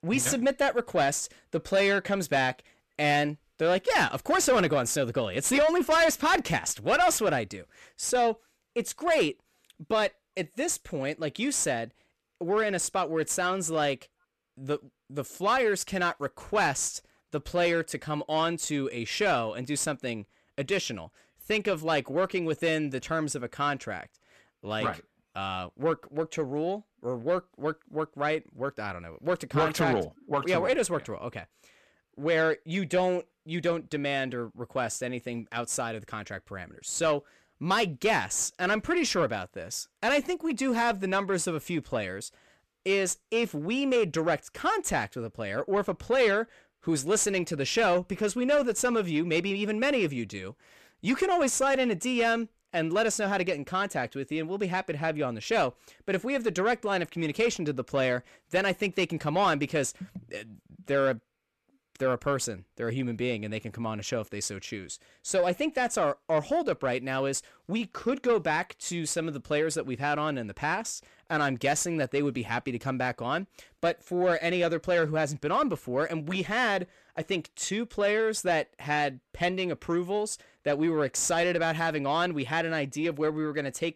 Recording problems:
distortion; slight; 10 dB below the speech

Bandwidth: 14 kHz